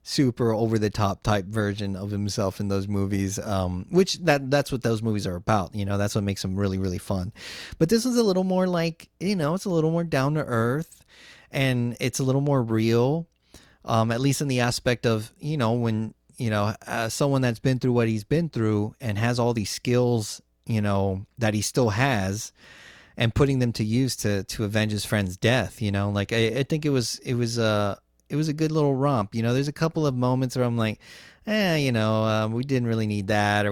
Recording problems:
abrupt cut into speech; at the end

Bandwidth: 19 kHz